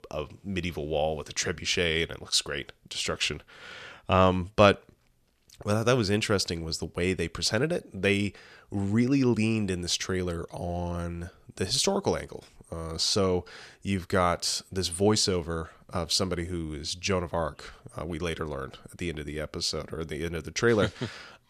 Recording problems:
none

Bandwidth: 14 kHz